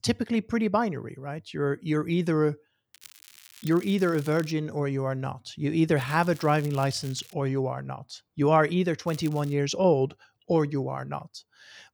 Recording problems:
crackling; faint; from 3 to 4.5 s, from 6 to 7.5 s and at 9 s; 20 dB below the speech

